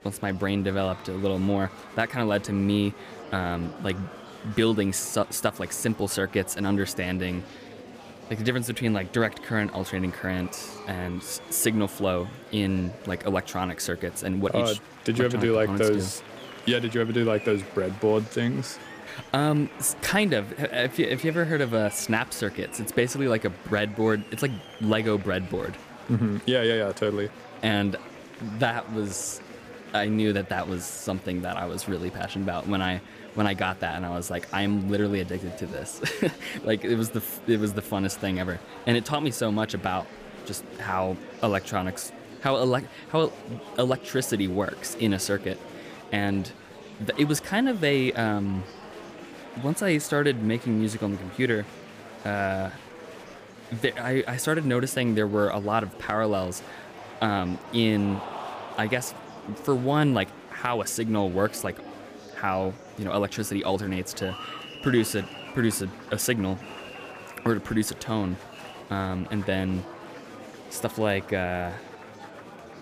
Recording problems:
murmuring crowd; noticeable; throughout; 15 dB below the speech

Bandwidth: 15 kHz